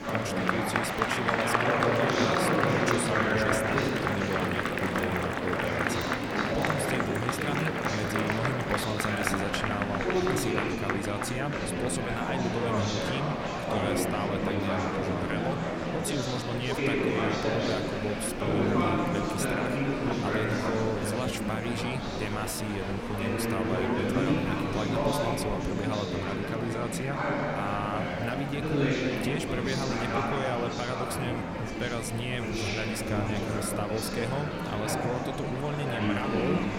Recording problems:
murmuring crowd; very loud; throughout; 5 dB above the speech
machinery noise; noticeable; throughout; 15 dB below the speech

